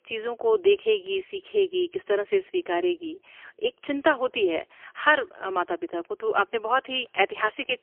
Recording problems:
phone-call audio; poor line; nothing above 3 kHz

